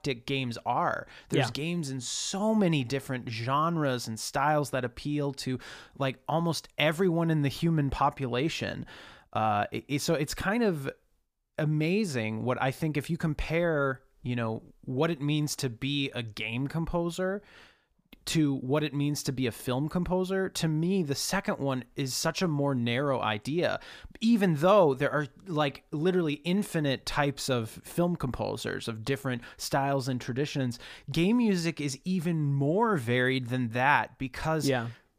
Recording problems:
none

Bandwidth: 15 kHz